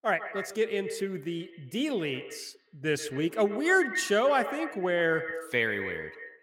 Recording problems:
echo of what is said; strong; throughout; 130 ms later, 9 dB below the speech

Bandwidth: 16.5 kHz